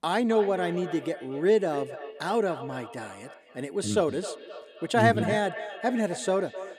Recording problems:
echo of what is said; noticeable; throughout; 260 ms later, 15 dB below the speech

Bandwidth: 15 kHz